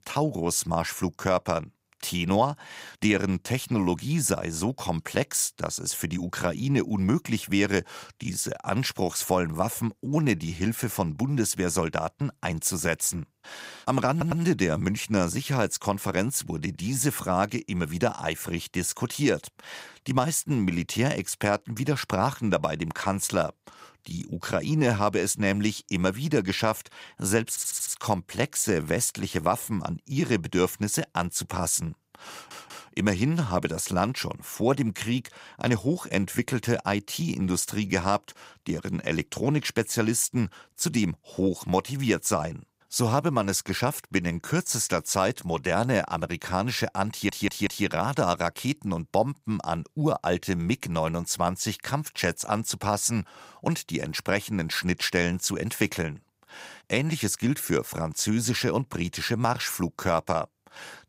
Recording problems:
audio stuttering; 4 times, first at 14 s

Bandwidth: 15.5 kHz